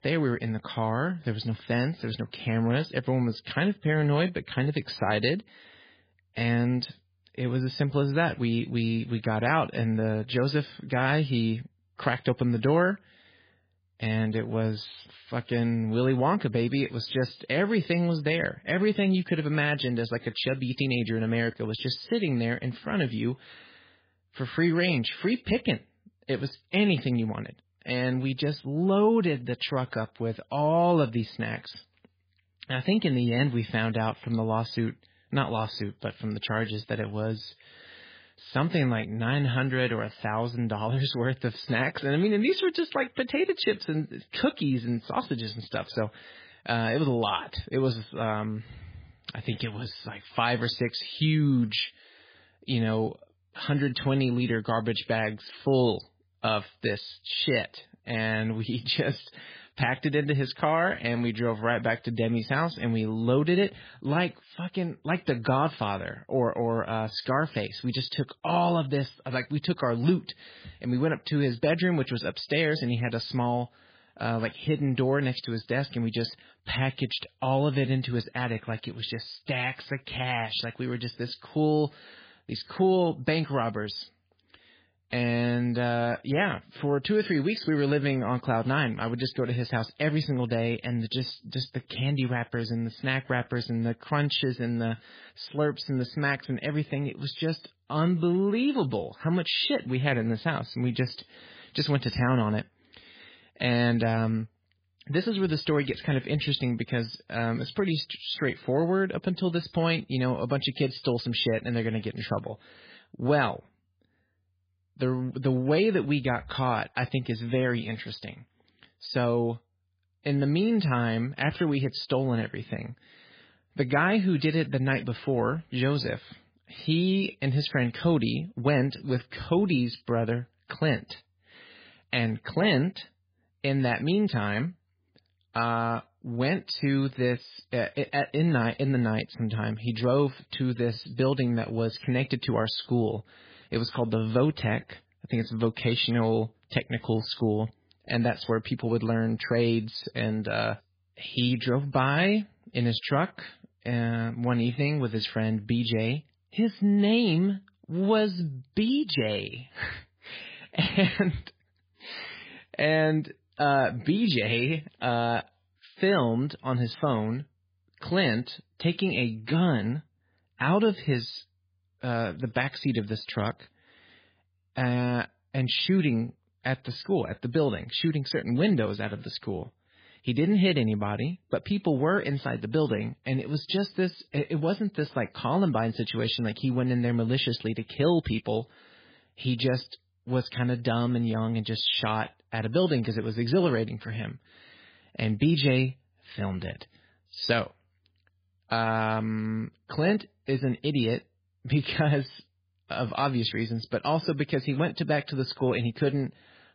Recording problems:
garbled, watery; badly; nothing above 5 kHz

